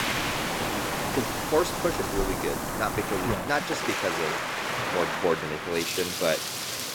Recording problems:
rain or running water; very loud; throughout; 1 dB above the speech

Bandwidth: 18 kHz